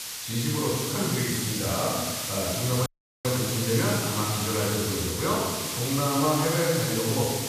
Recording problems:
room echo; strong; dies away in 1.4 s
off-mic speech; far
hiss; loud; throughout; 2 dB below the speech
audio cutting out; at 3 s

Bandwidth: 14.5 kHz